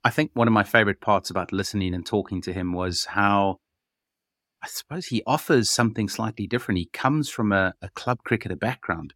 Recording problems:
none

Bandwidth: 17 kHz